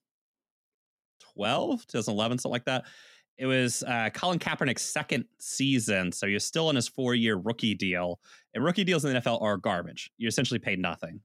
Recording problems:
none

